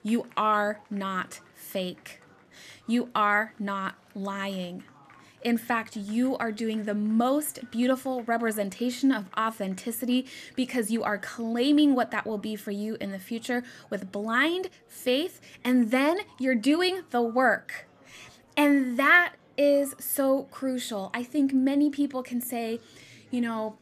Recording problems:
murmuring crowd; faint; throughout; 30 dB below the speech

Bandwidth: 14.5 kHz